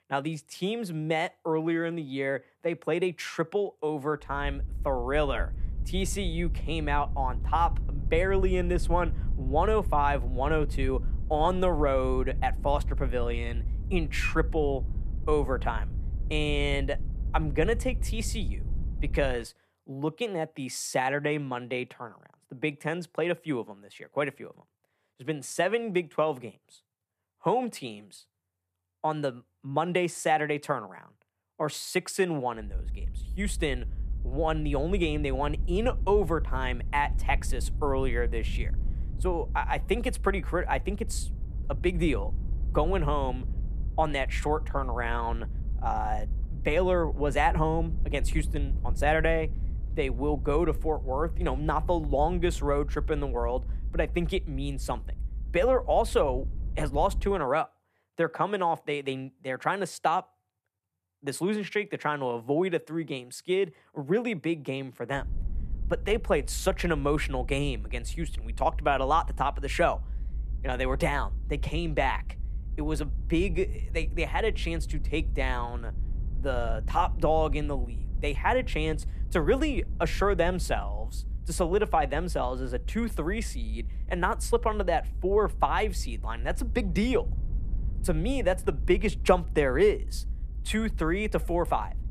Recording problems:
low rumble; faint; from 4.5 to 19 s, from 33 to 57 s and from 1:05 on; 25 dB below the speech

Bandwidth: 14.5 kHz